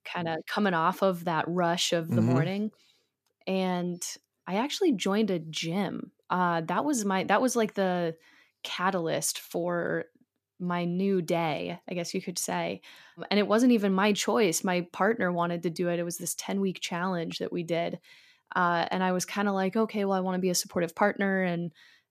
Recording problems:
none

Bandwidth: 14.5 kHz